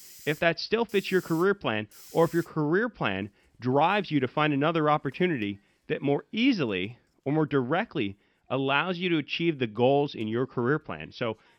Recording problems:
high frequencies cut off; noticeable; nothing above 5.5 kHz
hiss; faint; throughout; 20 dB below the speech

